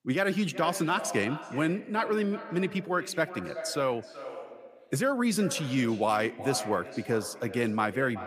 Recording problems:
echo of what is said; noticeable; throughout; 370 ms later, 10 dB below the speech

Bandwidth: 15 kHz